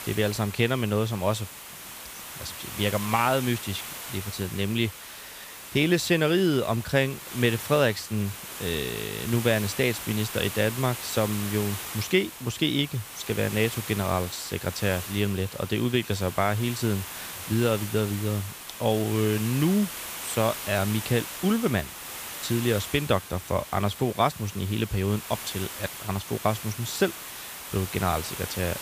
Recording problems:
hiss; loud; throughout; 9 dB below the speech

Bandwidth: 15 kHz